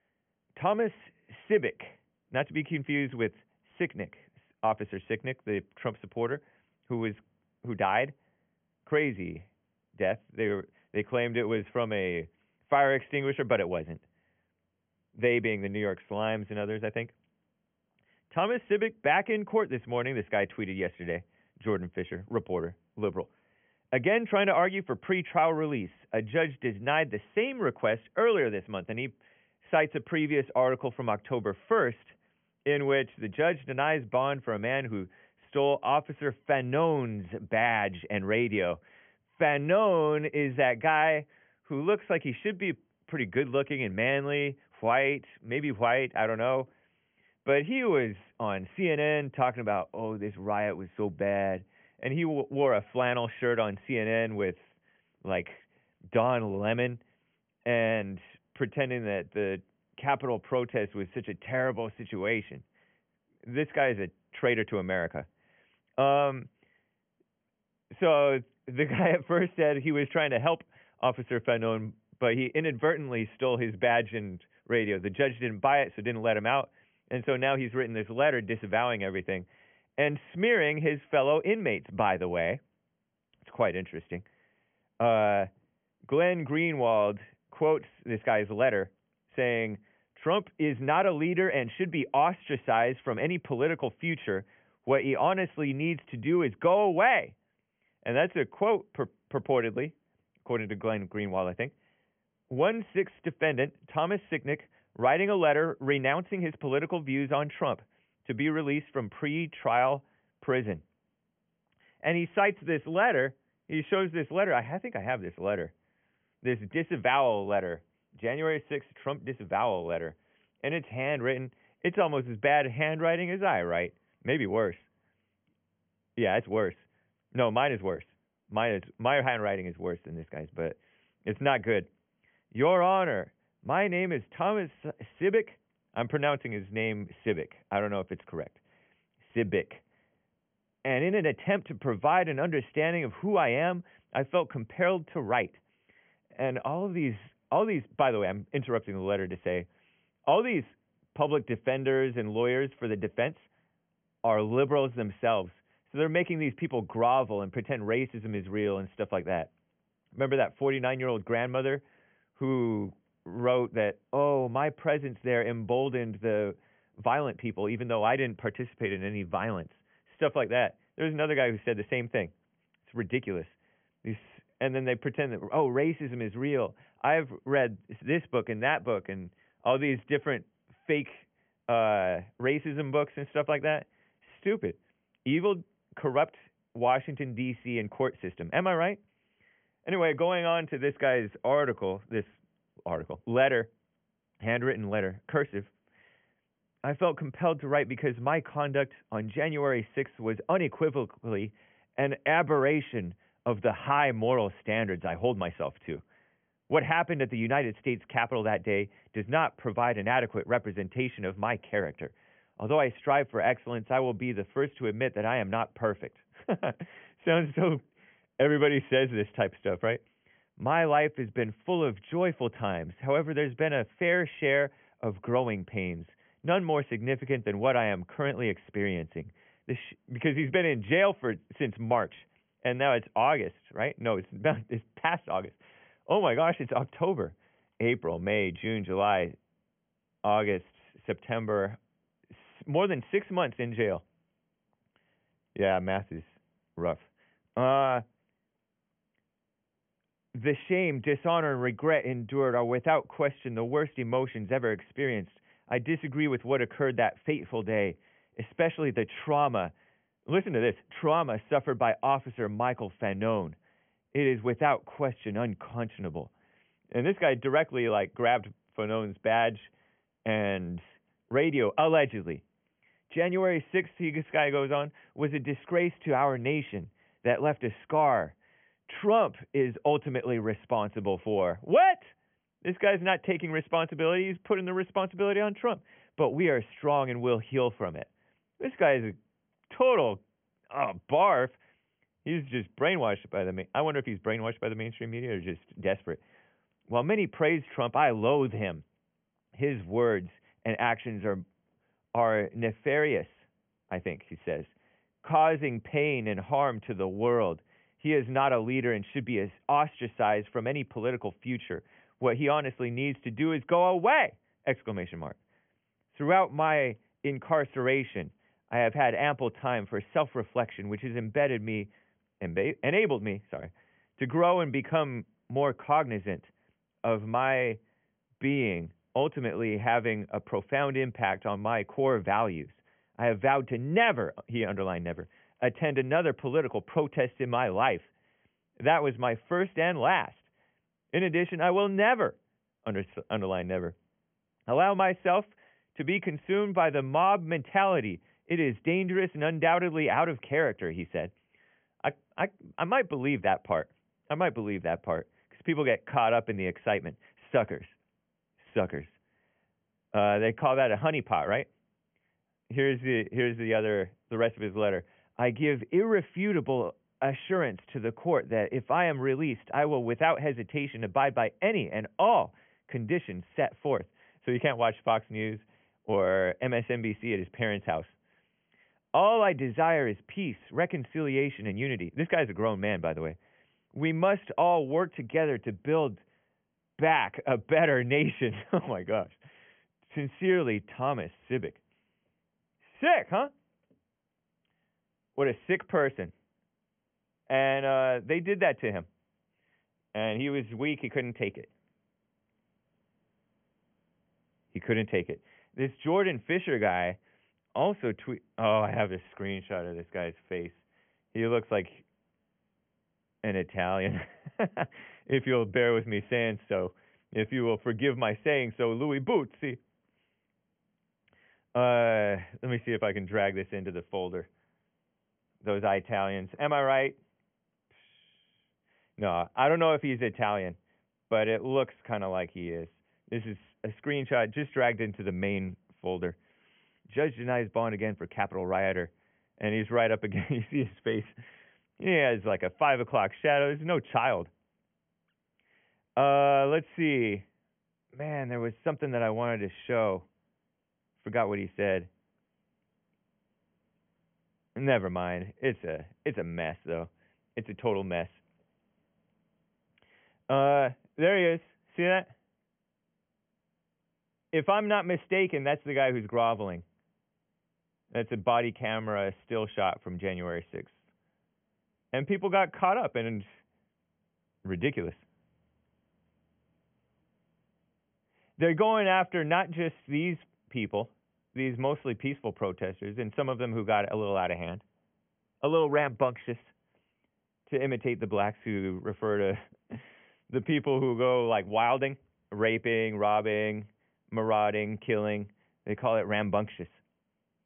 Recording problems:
high frequencies cut off; severe; nothing above 3 kHz

